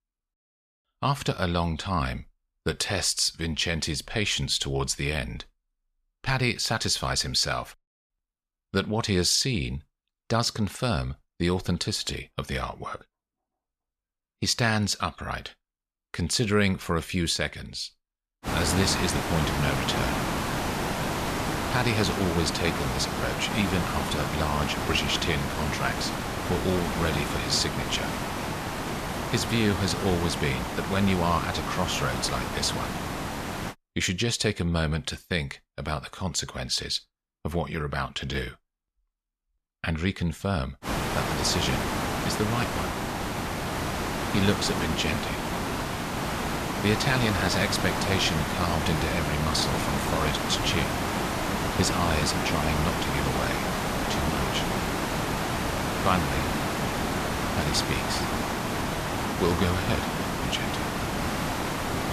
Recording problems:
hiss; loud; from 18 to 34 s and from 41 s on; 1 dB below the speech

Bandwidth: 14.5 kHz